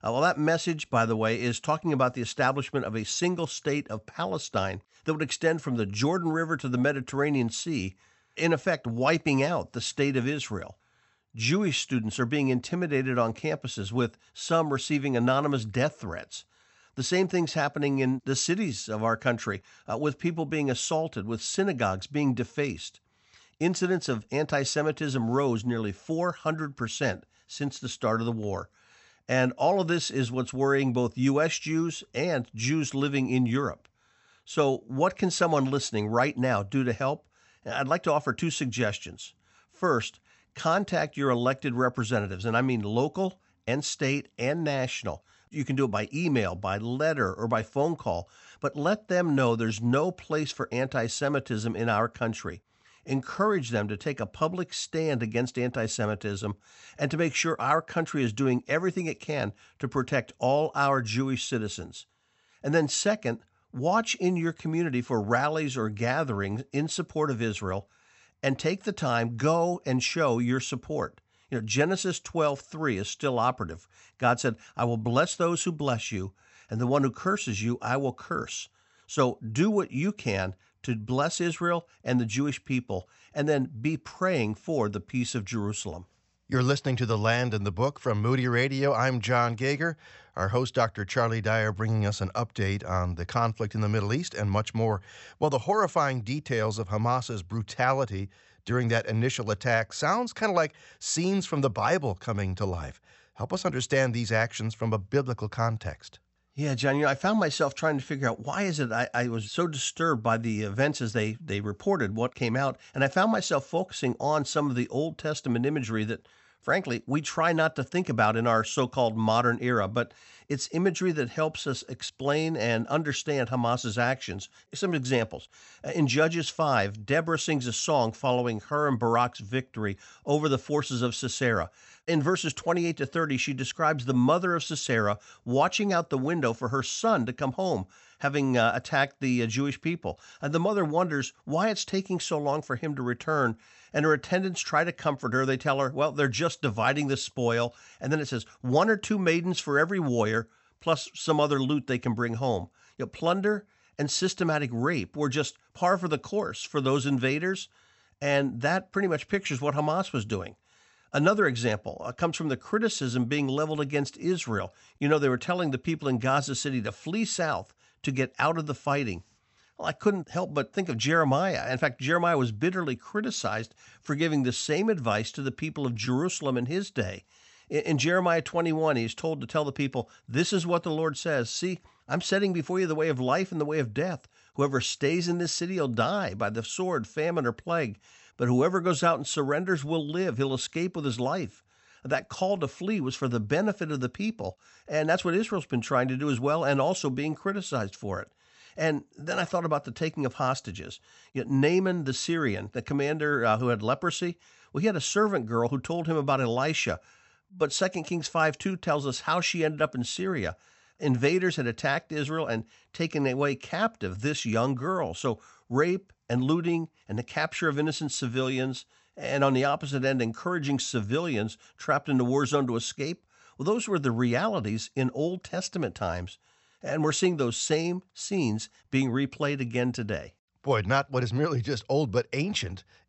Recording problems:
high frequencies cut off; noticeable; nothing above 8 kHz

